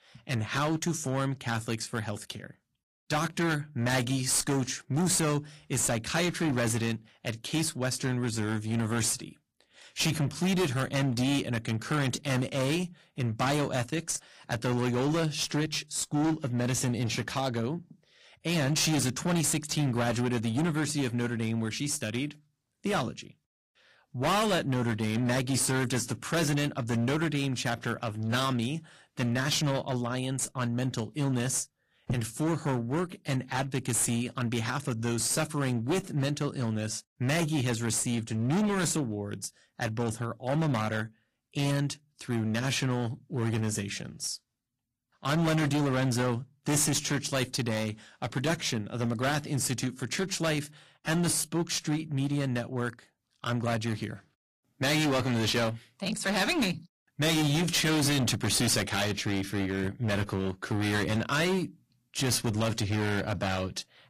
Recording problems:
distortion; heavy; 16% of the sound clipped
garbled, watery; slightly; nothing above 15 kHz

